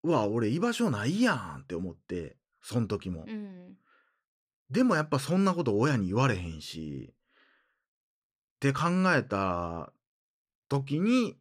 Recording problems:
none

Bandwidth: 15 kHz